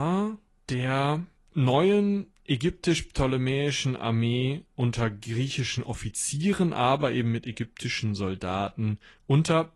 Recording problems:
garbled, watery; slightly
abrupt cut into speech; at the start

